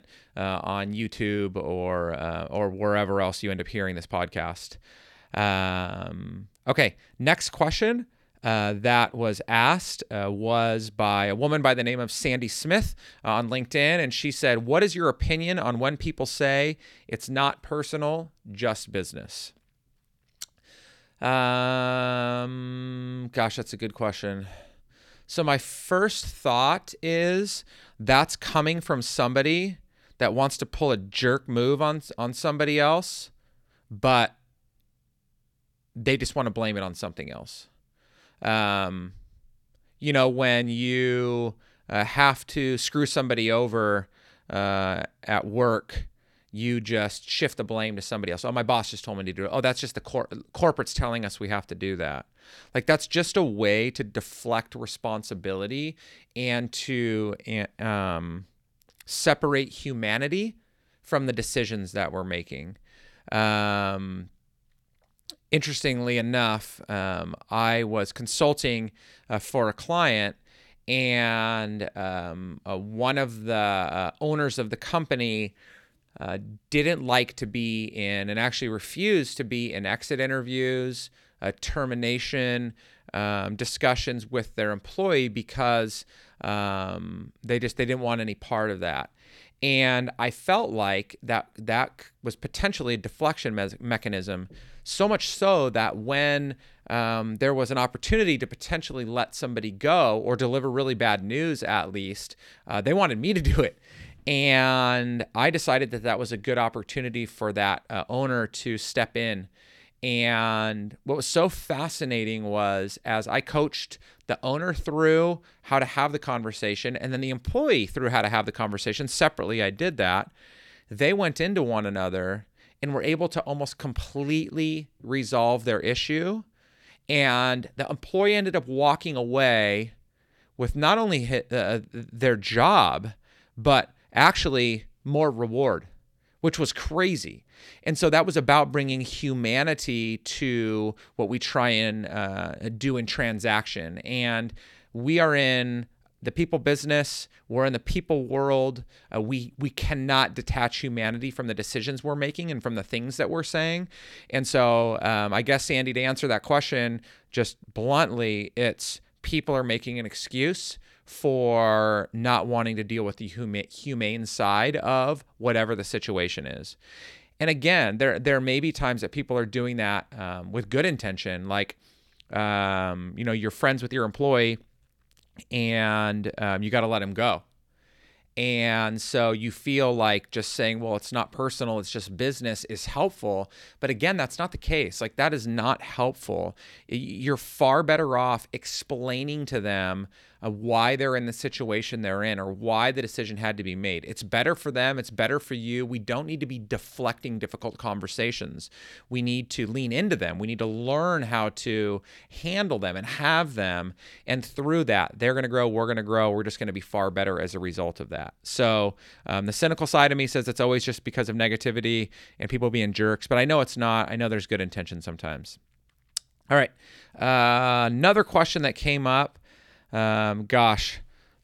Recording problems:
none

